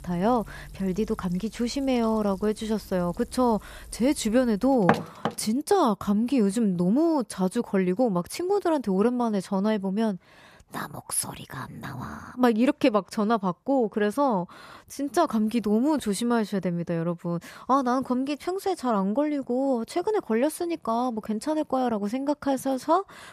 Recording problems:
household noises; loud; until 5 s; 2 dB below the speech

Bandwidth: 14.5 kHz